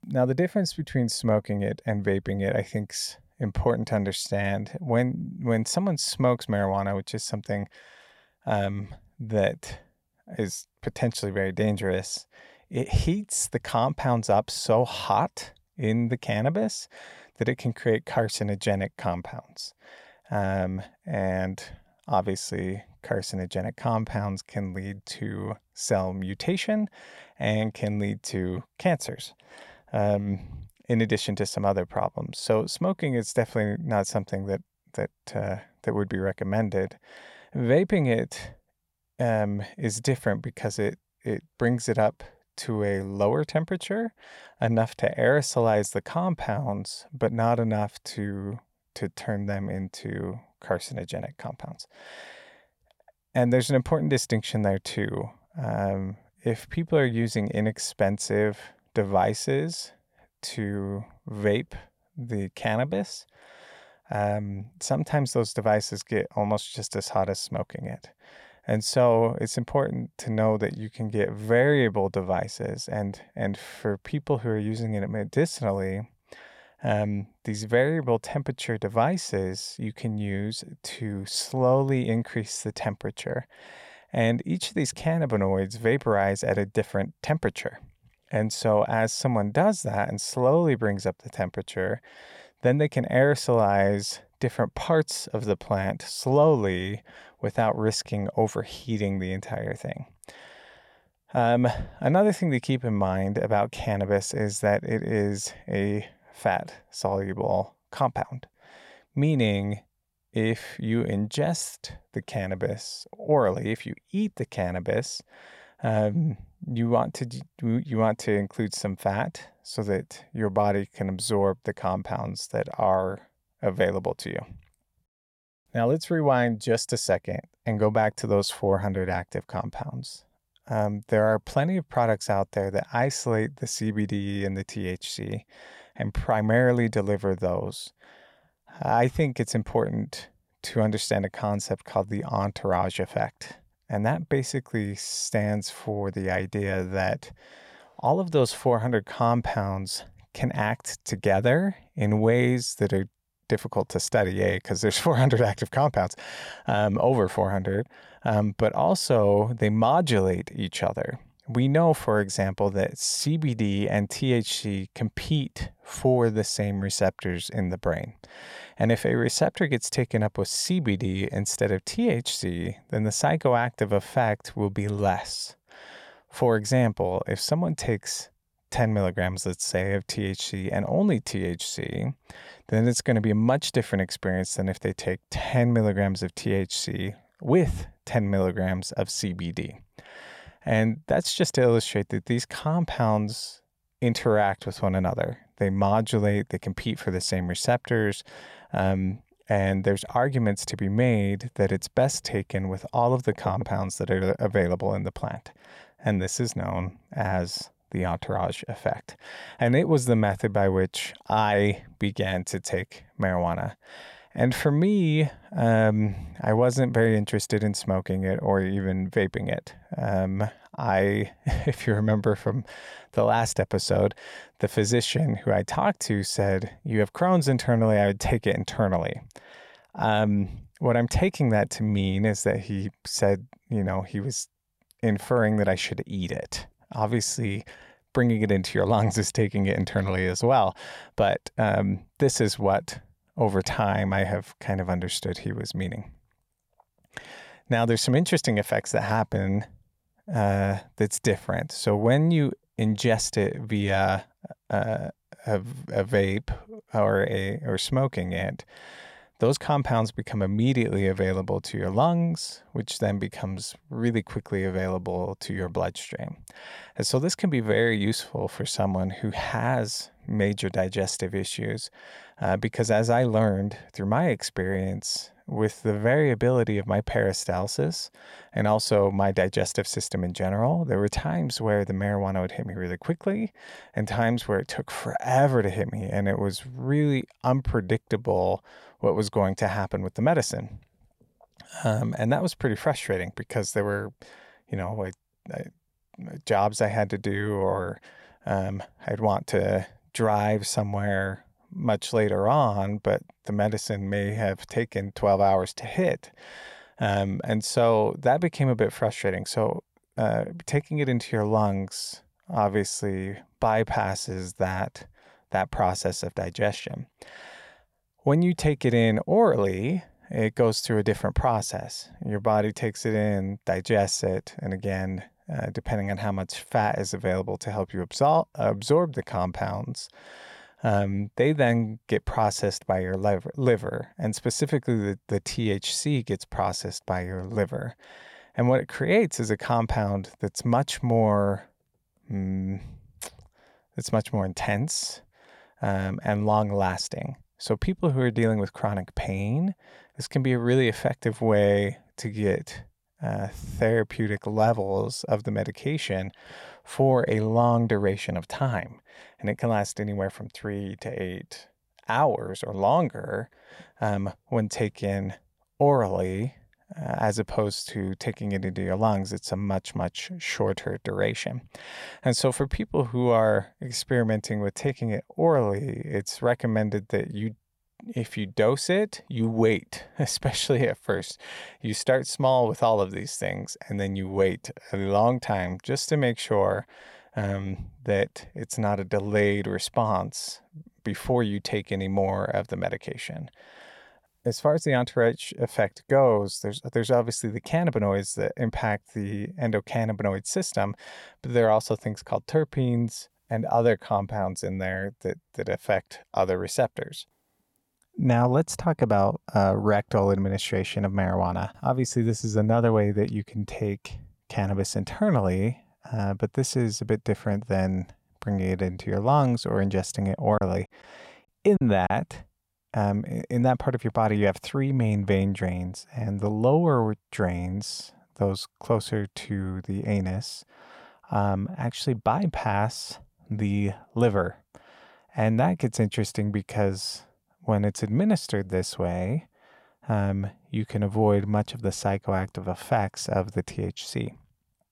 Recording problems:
choppy; very; from 7:01 to 7:02; 10% of the speech affected

